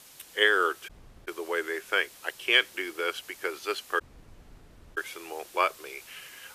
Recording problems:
thin; very; fading below 350 Hz
hiss; faint; throughout; 20 dB below the speech
audio cutting out; at 1 s and at 4 s for 1 s

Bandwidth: 14.5 kHz